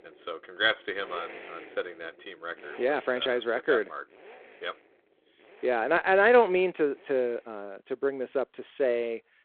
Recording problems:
phone-call audio; nothing above 3.5 kHz
traffic noise; faint; throughout; 20 dB below the speech

